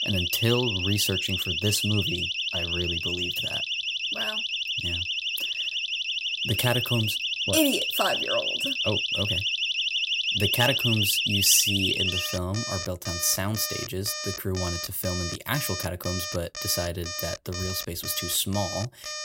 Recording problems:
alarms or sirens; very loud; throughout; 1 dB above the speech

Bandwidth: 16 kHz